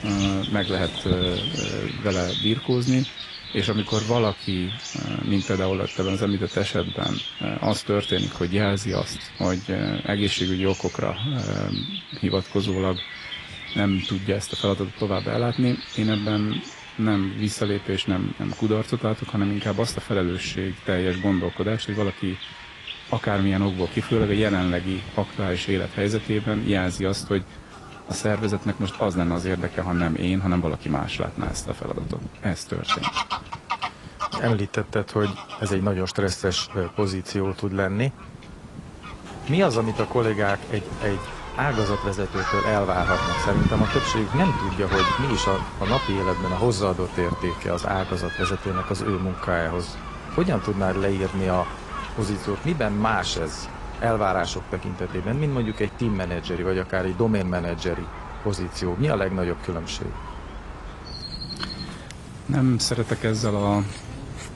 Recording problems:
garbled, watery; slightly; nothing above 10.5 kHz
animal sounds; loud; throughout; 7 dB below the speech
wind noise on the microphone; occasional gusts; 15 dB below the speech

